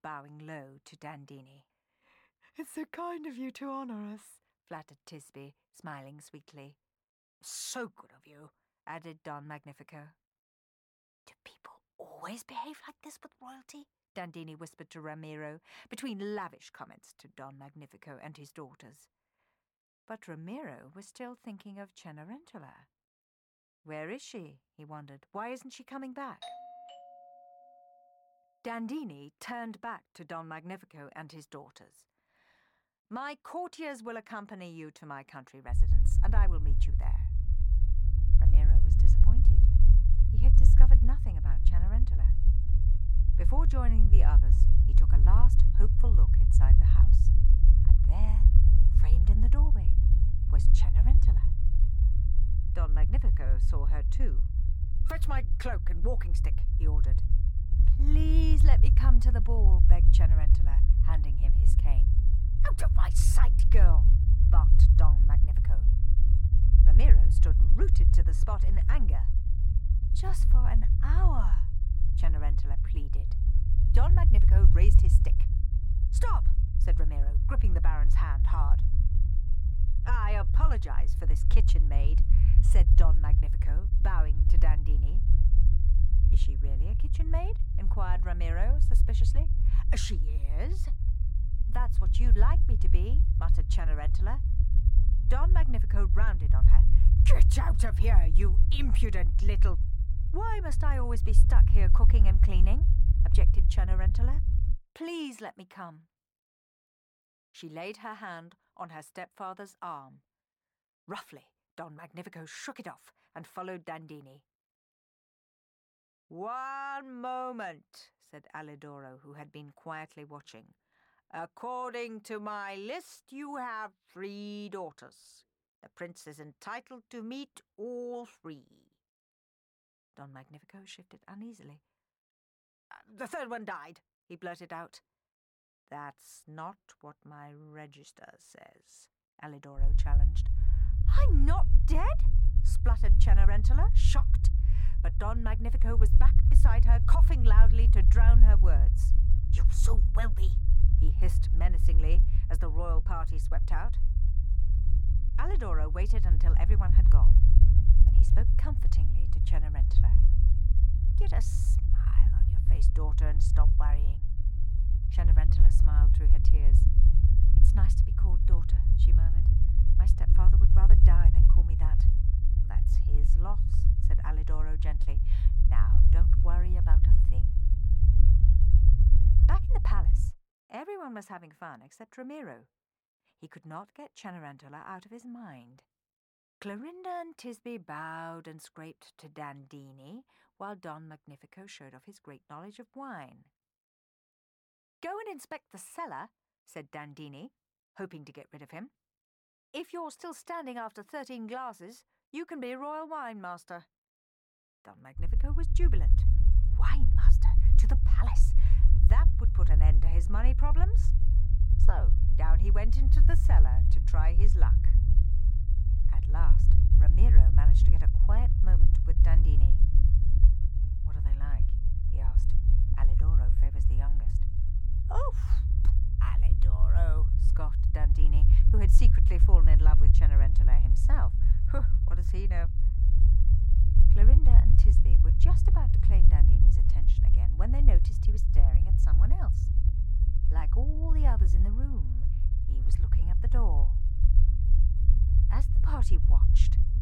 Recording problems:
low rumble; loud; from 36 s to 1:45, from 2:20 to 3:00 and from 3:25 on; 5 dB below the speech
doorbell; noticeable; from 26 to 28 s; peak 2 dB below the speech

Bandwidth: 17 kHz